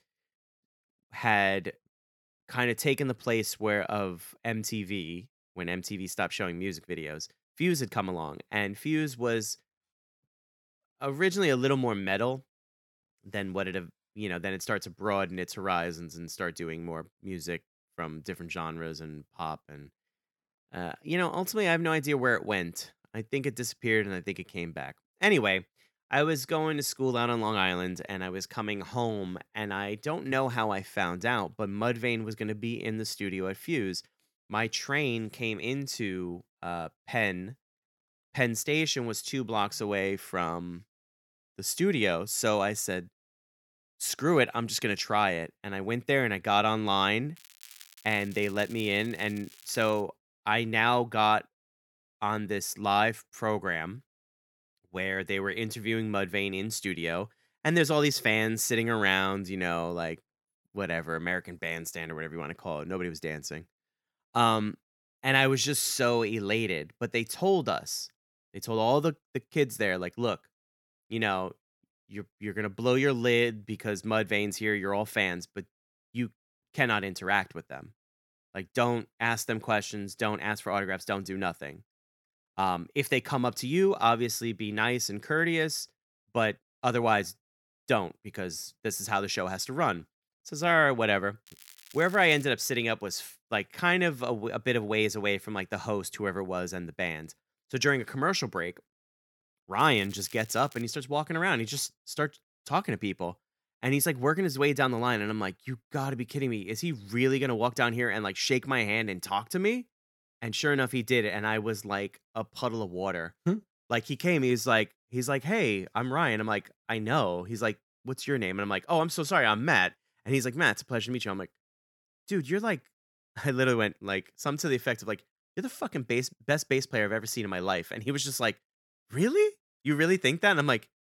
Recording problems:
crackling; faint; from 47 to 50 s, at 1:31 and from 1:40 to 1:41; 20 dB below the speech

